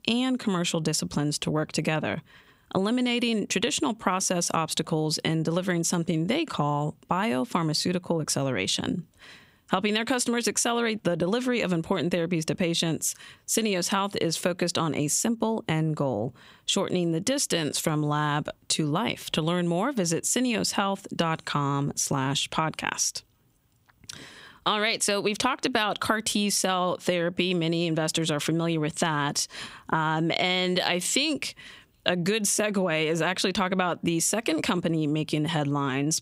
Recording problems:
squashed, flat; somewhat

